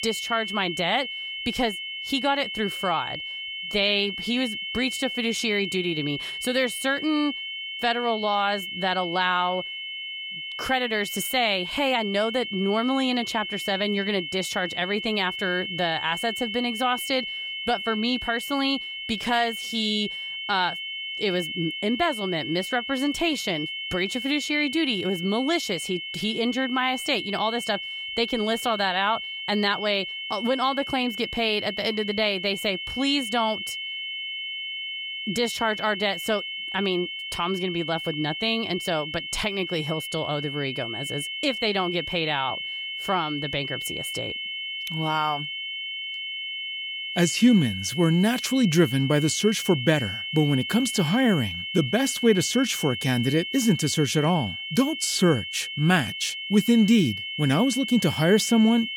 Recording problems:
high-pitched whine; loud; throughout; 3 kHz, 6 dB below the speech

